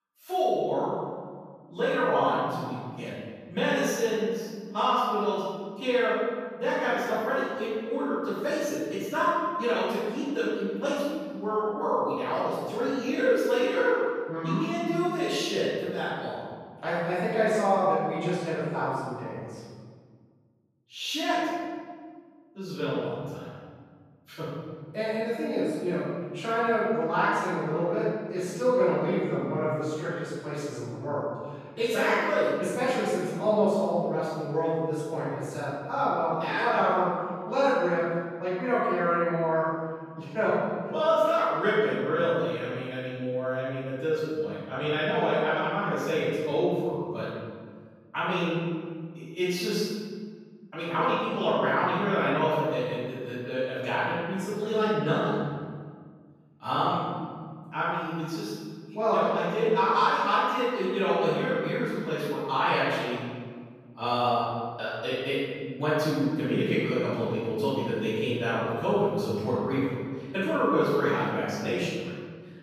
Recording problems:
room echo; strong; dies away in 1.7 s
off-mic speech; far

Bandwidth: 14.5 kHz